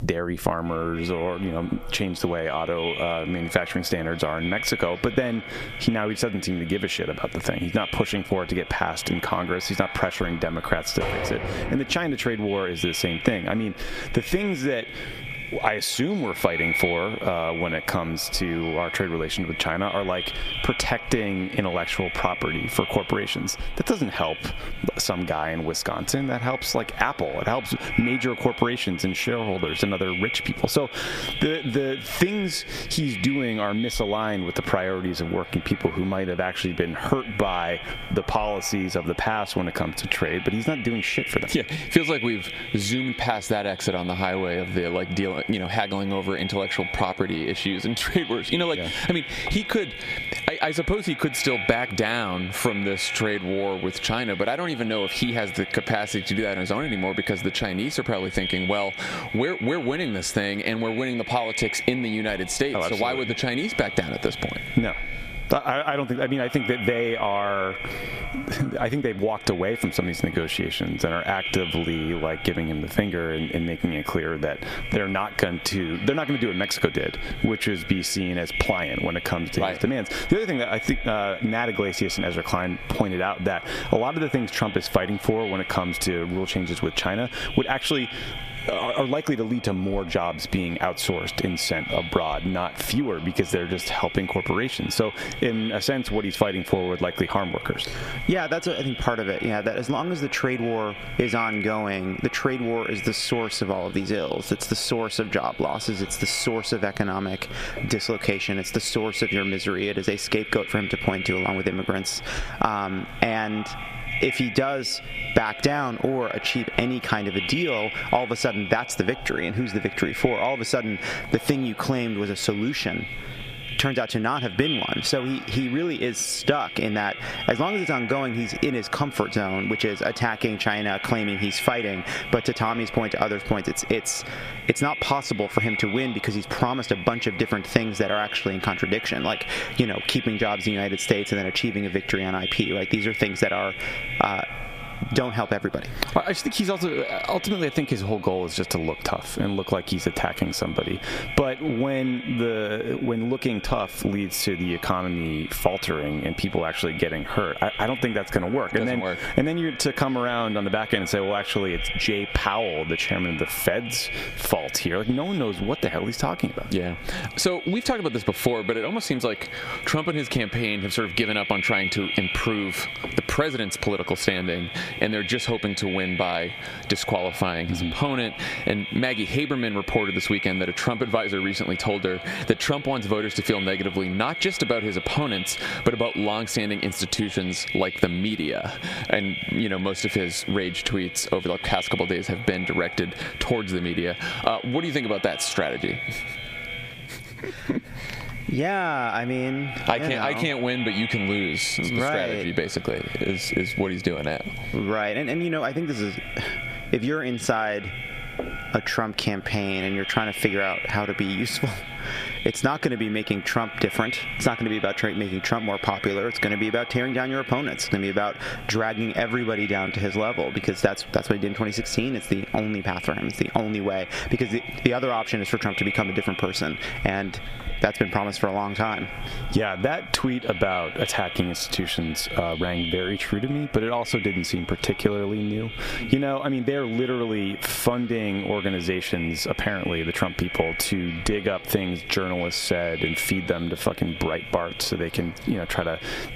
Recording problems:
echo of what is said; strong; throughout; 280 ms later, 7 dB below the speech
squashed, flat; heavily
door banging; noticeable; from 11 to 12 s; peak 3 dB below the speech

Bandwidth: 14.5 kHz